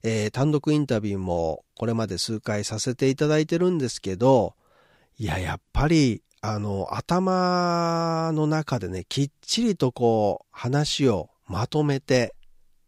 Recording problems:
none

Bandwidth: 15.5 kHz